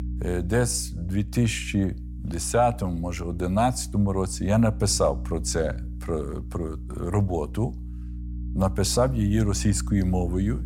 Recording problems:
electrical hum; faint; throughout; 60 Hz, 20 dB below the speech

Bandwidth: 16.5 kHz